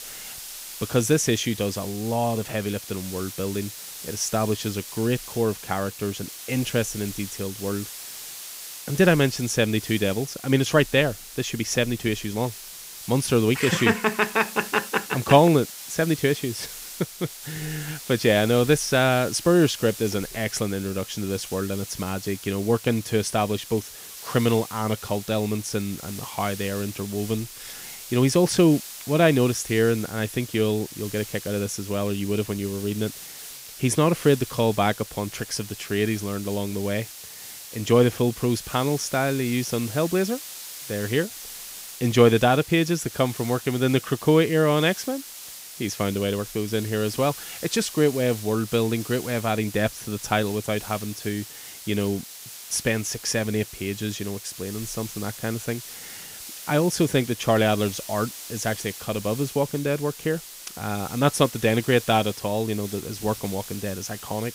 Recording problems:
hiss; noticeable; throughout; 10 dB below the speech

